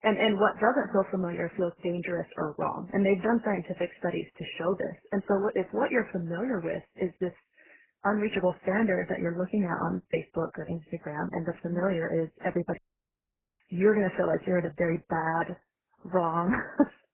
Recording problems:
garbled, watery; badly; nothing above 3 kHz
audio cutting out; at 13 s for 1 s

